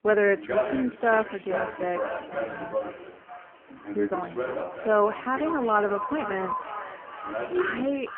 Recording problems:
phone-call audio; poor line
echo of what is said; strong; throughout; 480 ms later, 9 dB below the speech
voice in the background; loud; throughout; 6 dB below the speech
traffic noise; faint; throughout; 25 dB below the speech

